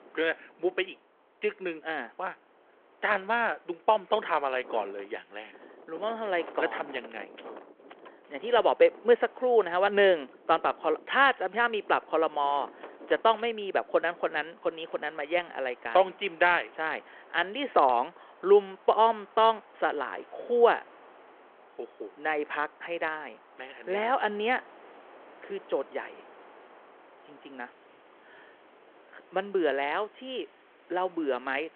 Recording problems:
phone-call audio
wind in the background; faint; throughout; 25 dB below the speech

